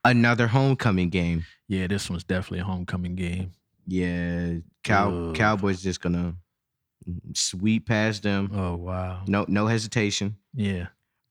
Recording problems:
none

